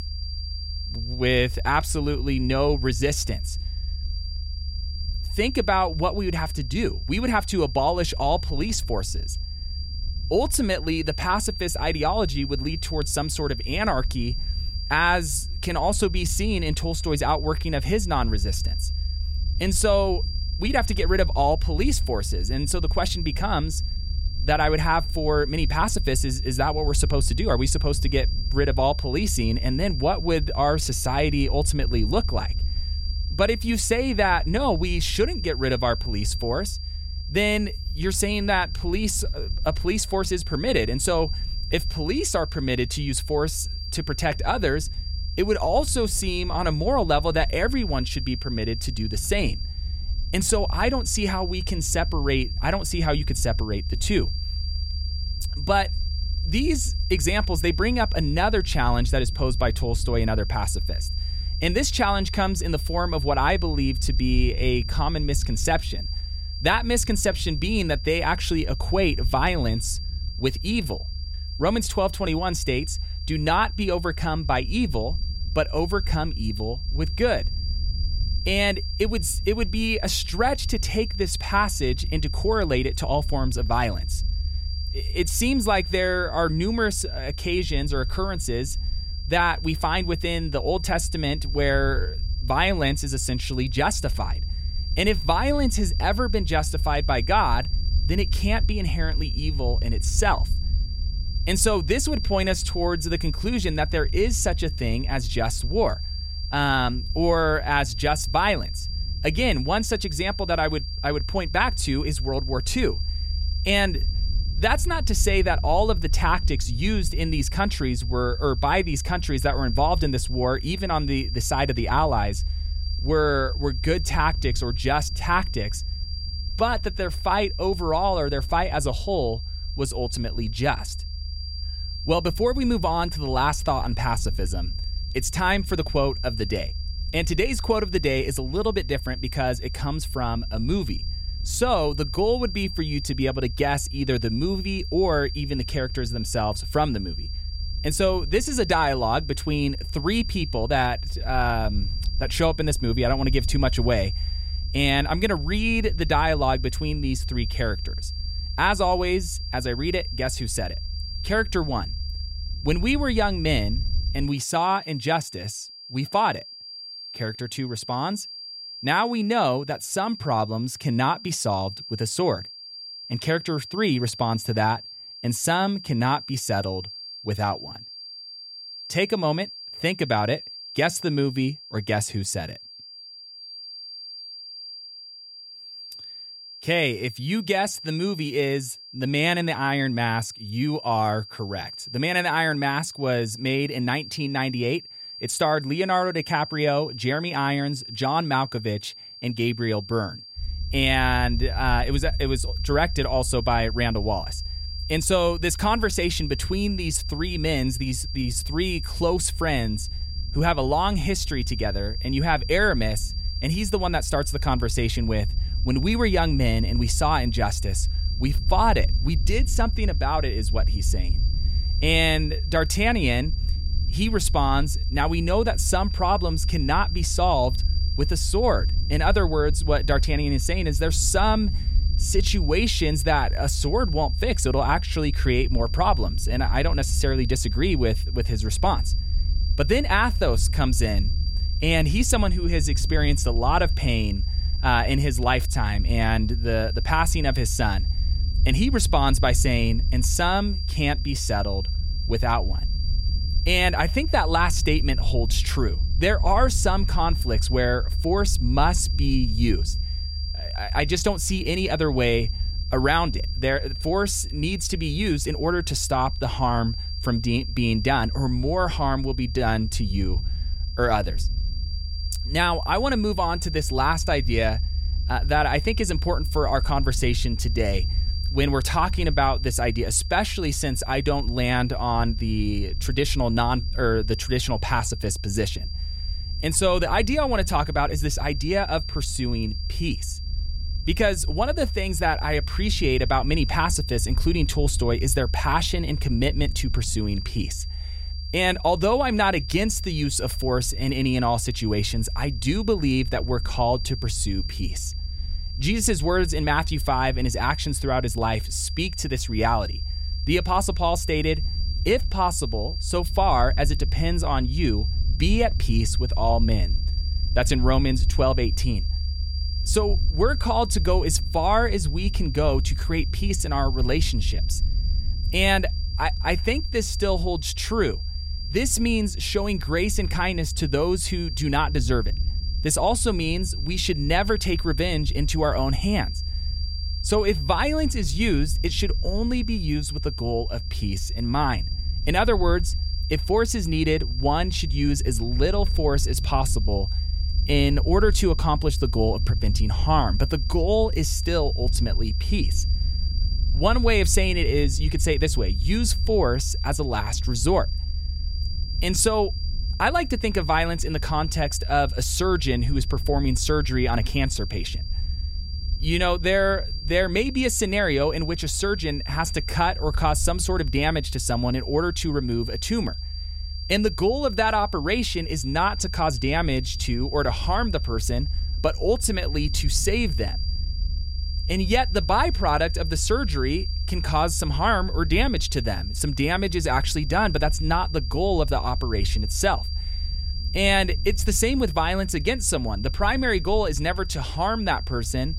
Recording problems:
high-pitched whine; noticeable; throughout; 4.5 kHz, 10 dB below the speech
low rumble; faint; until 2:44 and from 3:20 on; 25 dB below the speech

